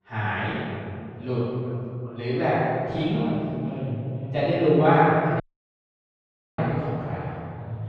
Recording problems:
room echo; strong; dies away in 2.6 s
off-mic speech; far
muffled; very; fading above 2 kHz
voice in the background; faint; throughout; 30 dB below the speech
audio cutting out; at 5.5 s for 1 s

